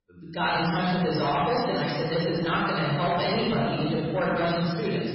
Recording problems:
room echo; strong; dies away in 1.8 s
off-mic speech; far
garbled, watery; badly; nothing above 5.5 kHz
distortion; slight; 16% of the sound clipped

